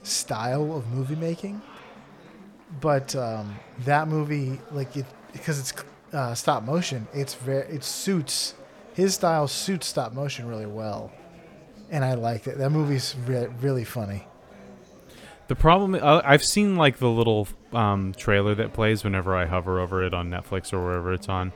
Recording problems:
chatter from many people; faint; throughout; 25 dB below the speech

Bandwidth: 18.5 kHz